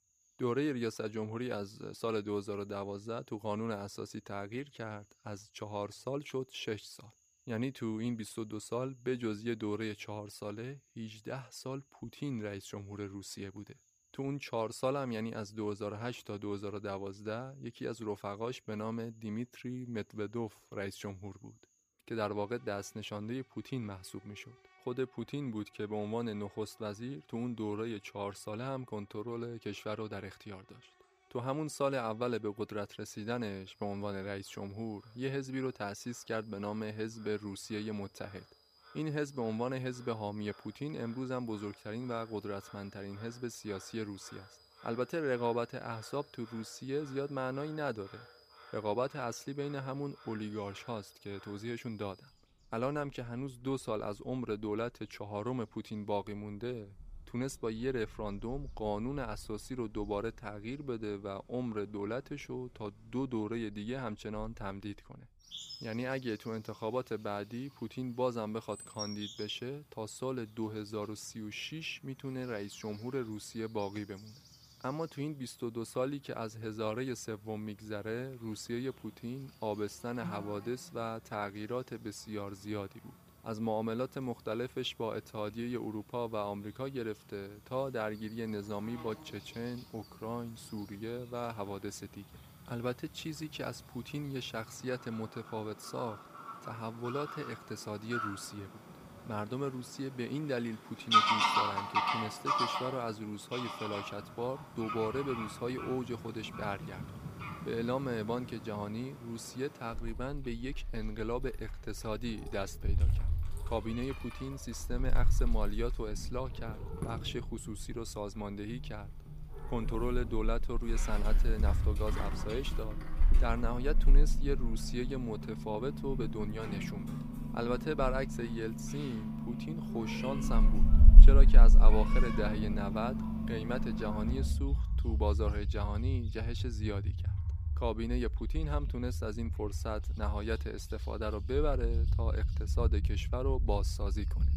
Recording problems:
animal sounds; very loud; throughout; 5 dB above the speech

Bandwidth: 15 kHz